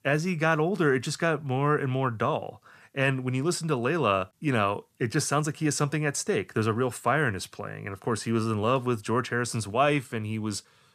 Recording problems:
none

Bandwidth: 14.5 kHz